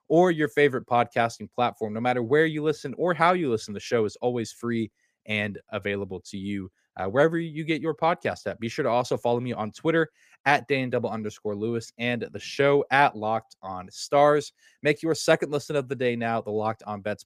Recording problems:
none

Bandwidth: 15 kHz